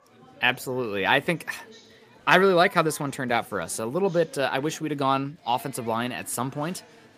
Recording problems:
murmuring crowd; faint; throughout; 25 dB below the speech

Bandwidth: 15 kHz